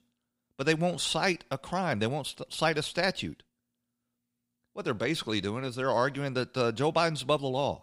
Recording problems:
none

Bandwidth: 15.5 kHz